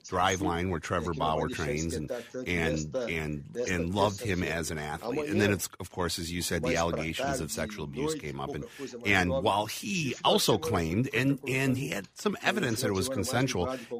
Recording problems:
voice in the background; loud; throughout; 7 dB below the speech

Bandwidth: 15 kHz